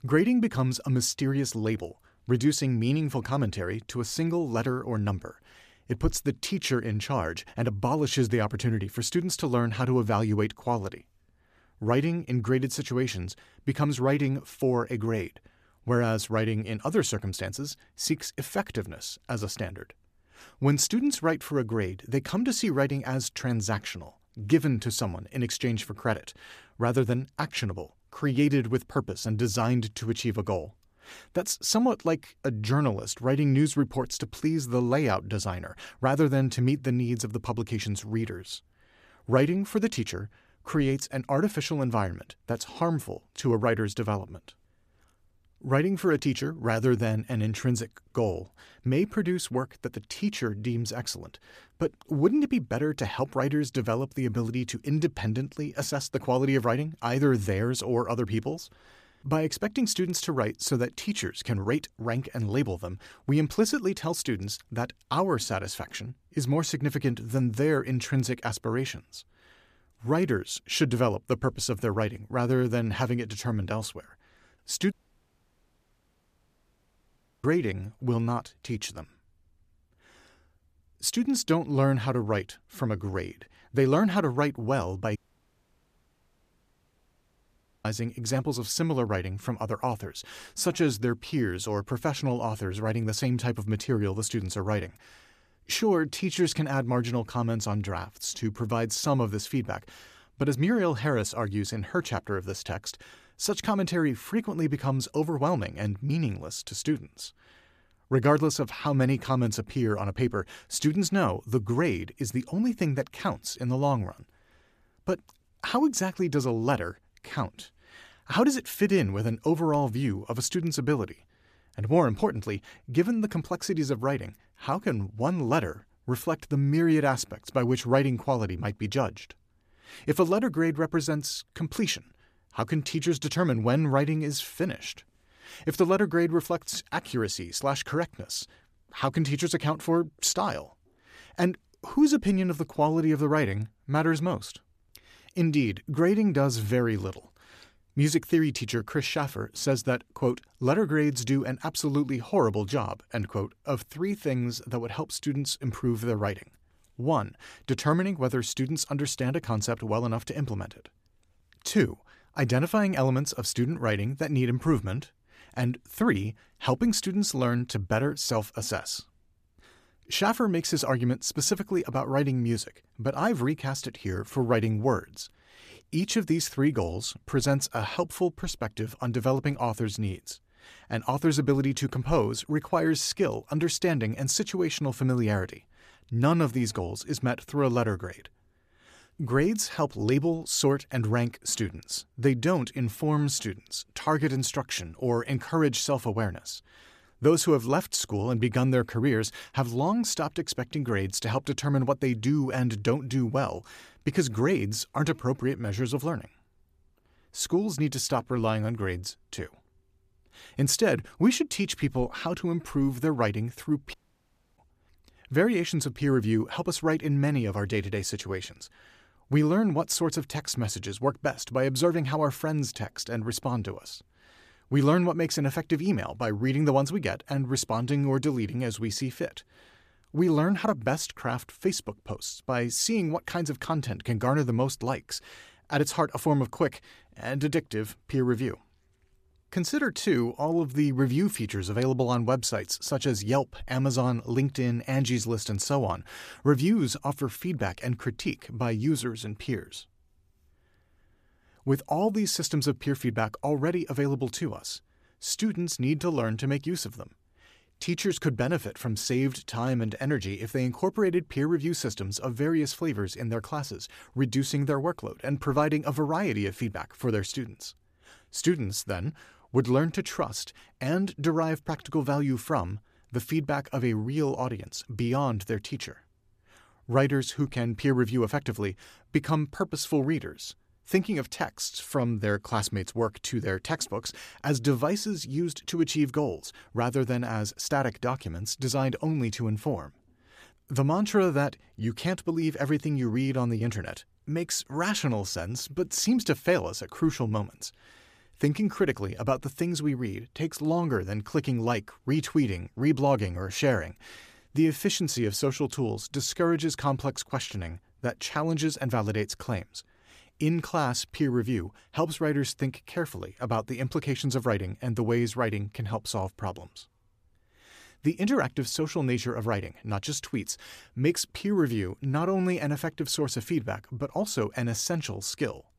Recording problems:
audio cutting out; at 1:15 for 2.5 s, at 1:25 for 2.5 s and at 3:34 for 0.5 s

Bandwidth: 14.5 kHz